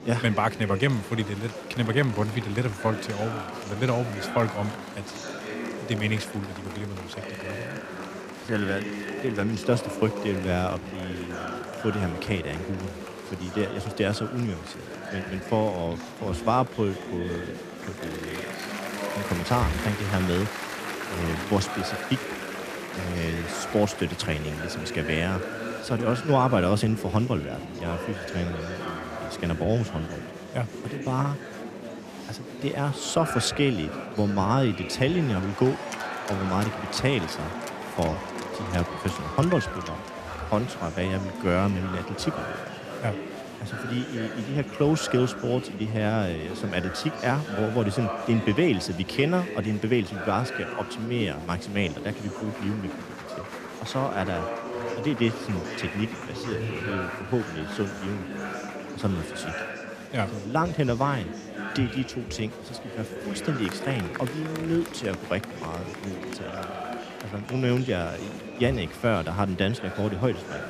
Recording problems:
murmuring crowd; loud; throughout; 7 dB below the speech

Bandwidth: 14.5 kHz